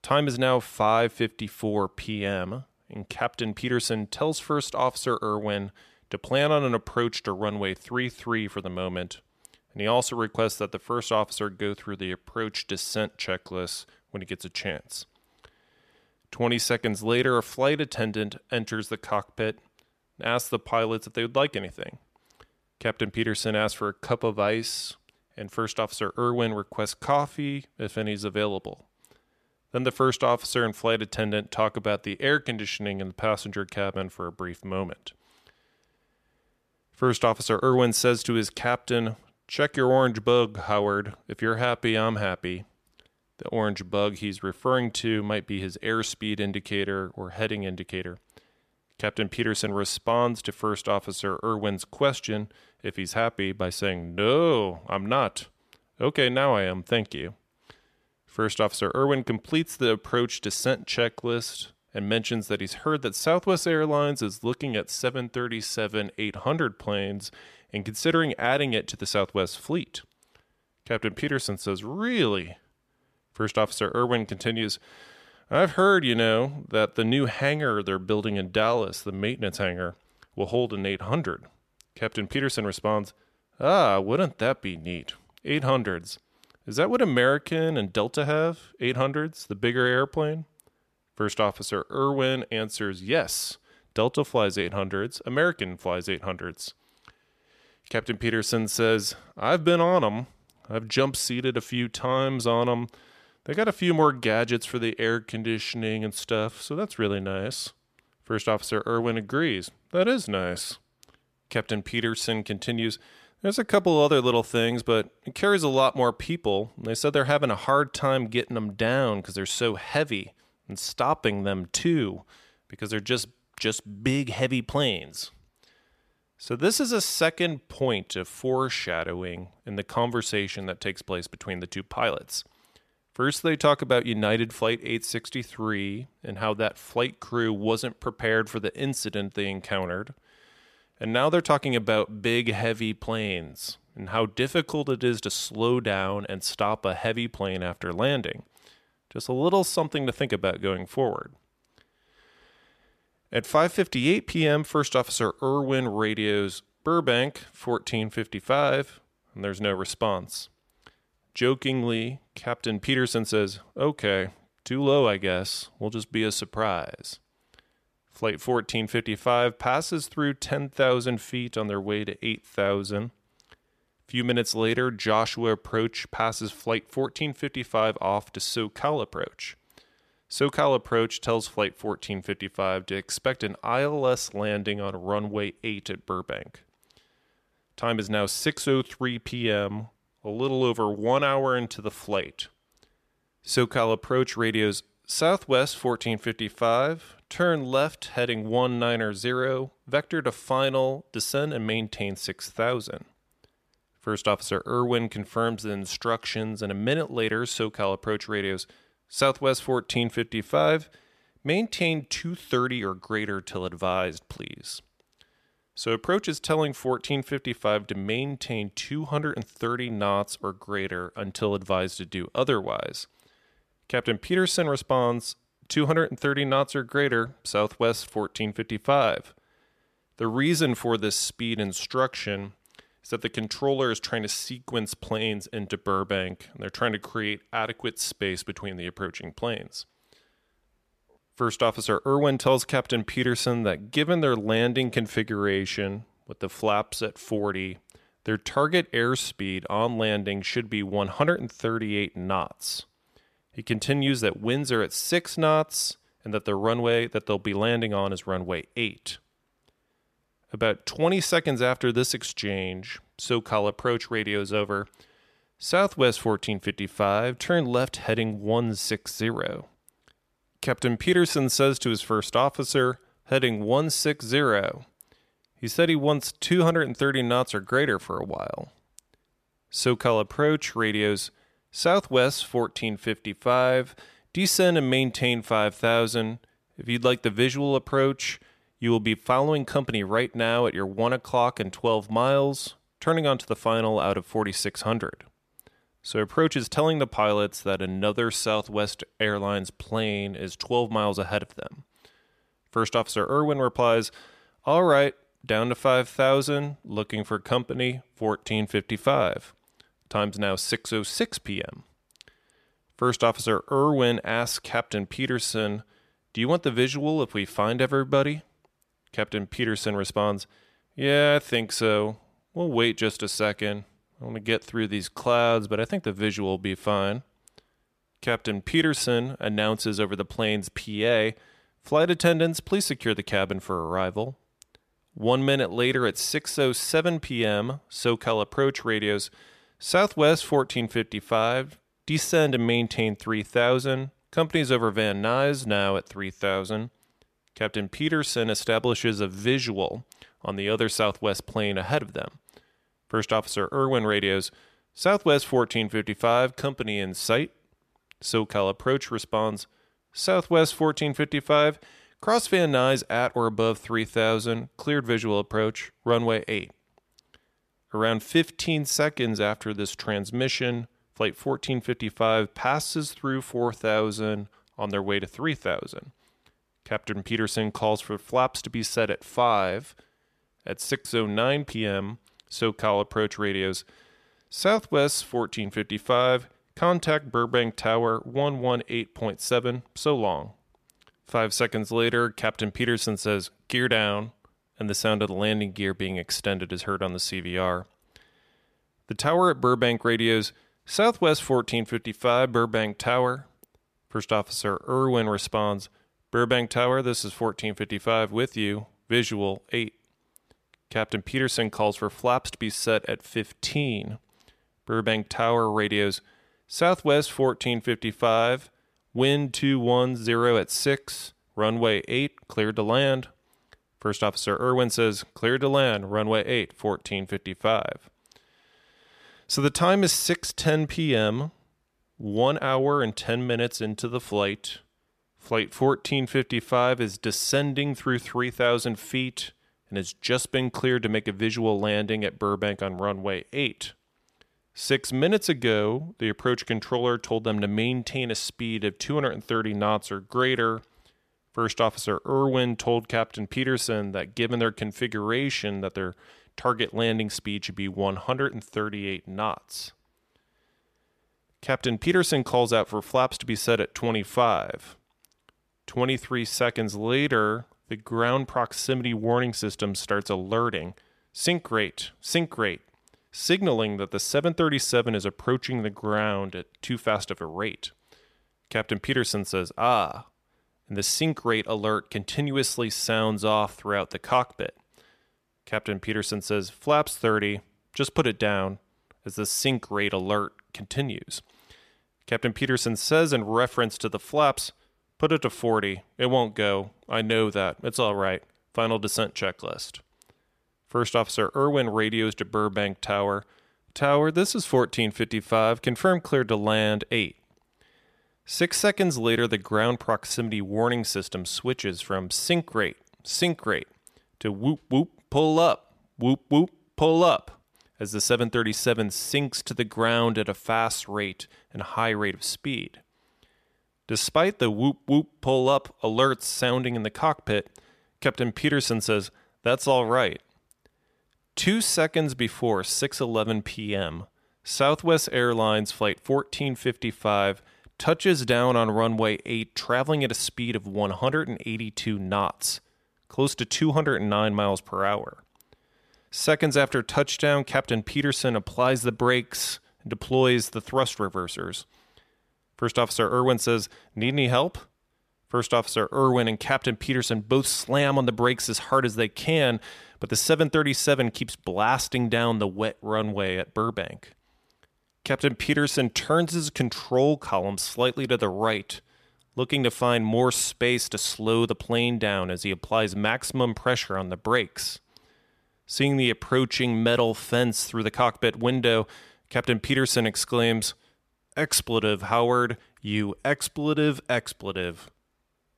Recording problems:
none

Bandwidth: 14.5 kHz